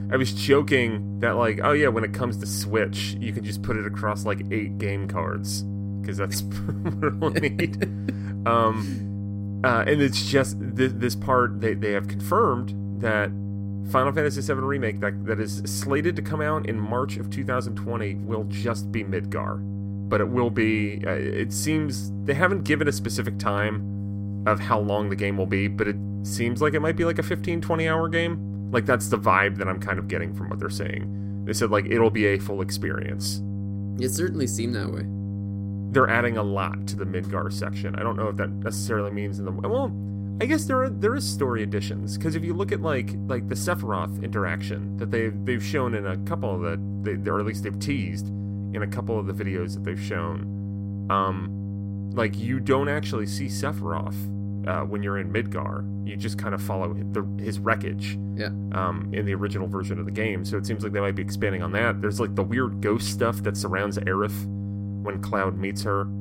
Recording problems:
electrical hum; noticeable; throughout; 50 Hz, 15 dB below the speech

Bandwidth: 16 kHz